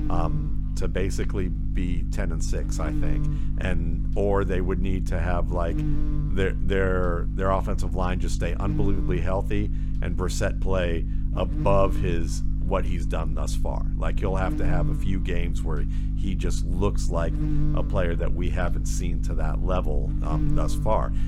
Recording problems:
electrical hum; loud; throughout; 50 Hz, 10 dB below the speech

